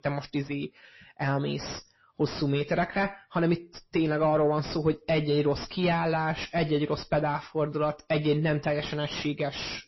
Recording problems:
distortion; heavy; 7 dB below the speech
garbled, watery; slightly; nothing above 5.5 kHz

